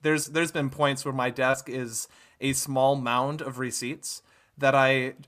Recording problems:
none

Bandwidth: 14.5 kHz